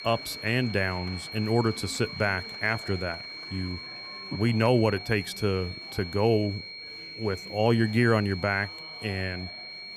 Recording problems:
high-pitched whine; noticeable; throughout; 4.5 kHz, 10 dB below the speech
murmuring crowd; faint; throughout; 20 dB below the speech

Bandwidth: 15 kHz